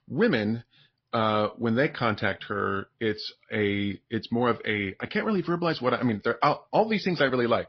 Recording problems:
garbled, watery; slightly; nothing above 5 kHz
high frequencies cut off; slight

